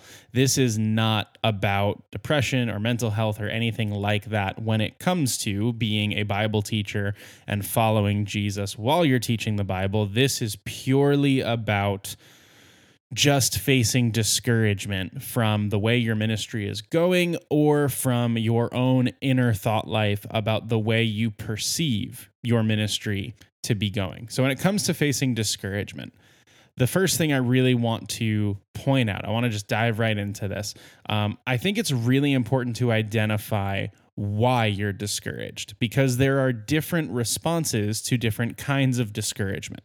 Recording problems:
none

